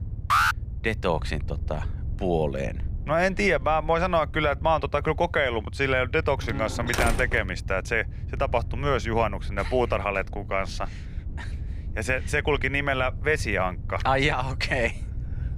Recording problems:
low rumble; faint; throughout; 25 dB below the speech
alarm; loud; at 0.5 s; peak 4 dB above the speech
door banging; noticeable; from 6.5 to 7.5 s; peak 1 dB below the speech

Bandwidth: 15 kHz